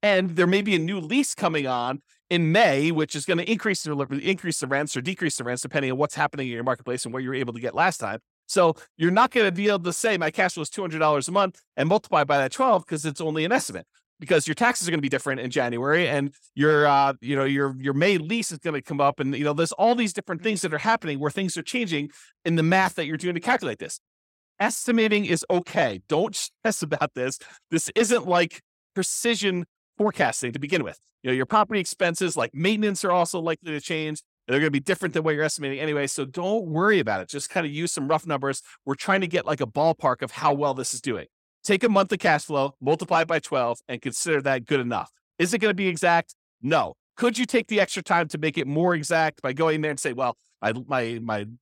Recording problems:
uneven, jittery; strongly; from 9.5 to 49 s

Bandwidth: 16.5 kHz